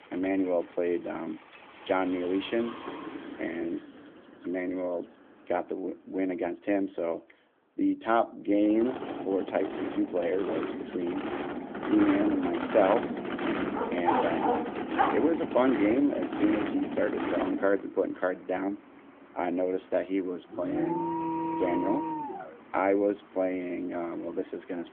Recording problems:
phone-call audio; nothing above 3.5 kHz
traffic noise; loud; throughout; 5 dB below the speech
door banging; faint; at 3 s; peak 15 dB below the speech
dog barking; loud; from 14 to 15 s; peak 1 dB above the speech
alarm; noticeable; from 21 to 23 s; peak 1 dB below the speech

